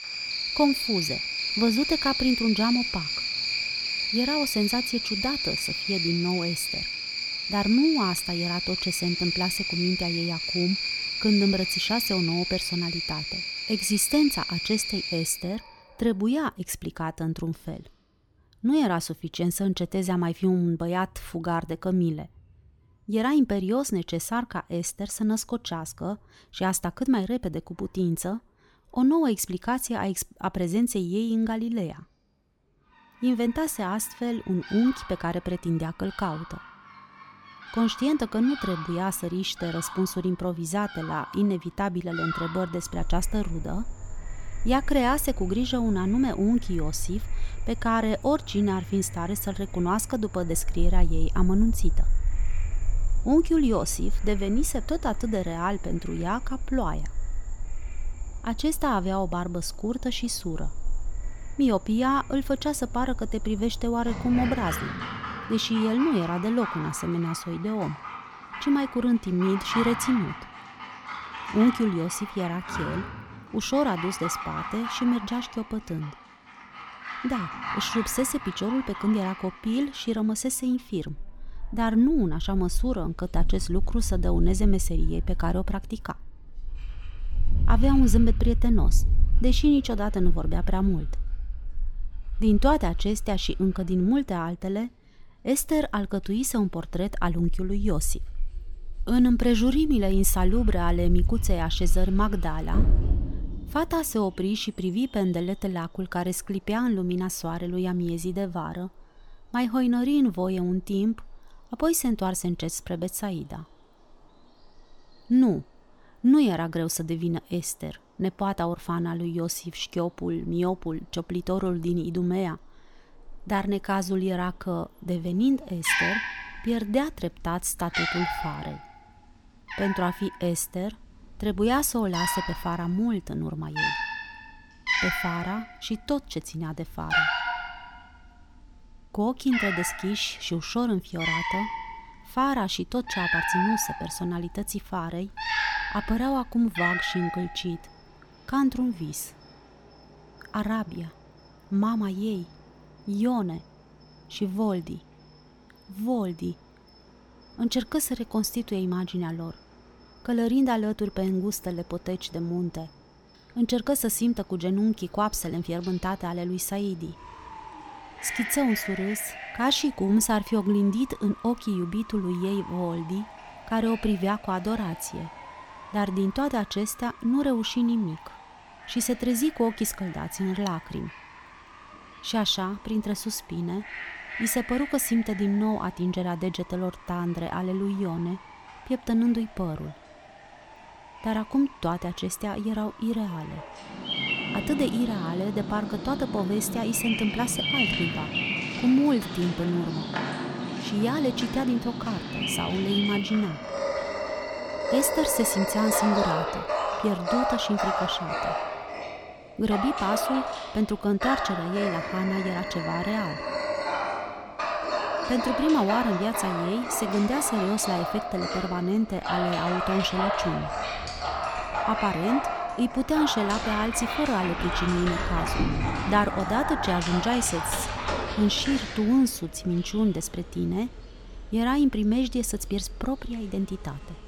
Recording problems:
animal sounds; loud; throughout; 4 dB below the speech

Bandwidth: 18 kHz